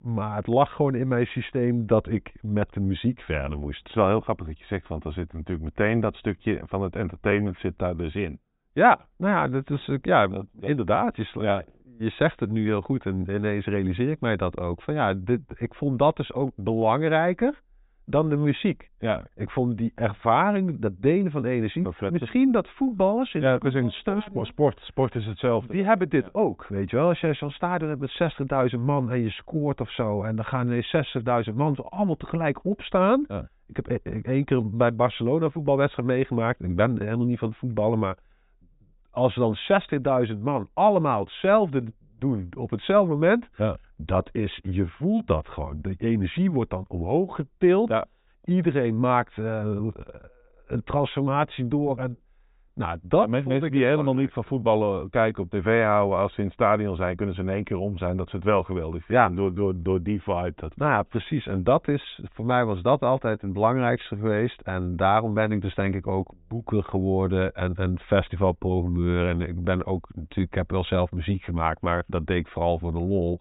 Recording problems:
high frequencies cut off; severe; nothing above 4 kHz

